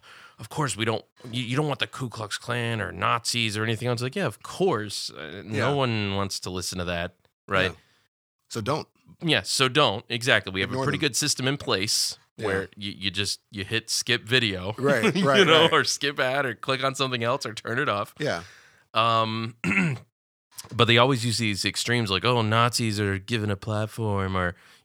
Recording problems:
none

